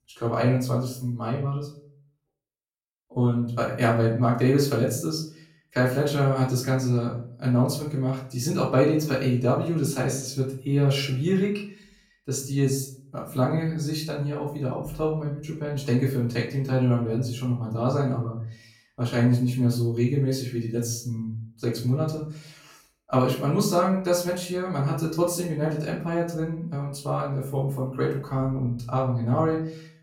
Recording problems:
off-mic speech; far
room echo; slight; dies away in 0.4 s

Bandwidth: 16.5 kHz